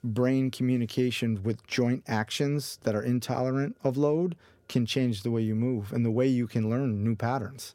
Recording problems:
none

